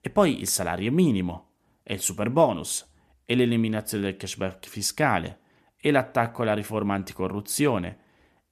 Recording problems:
none

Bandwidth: 14 kHz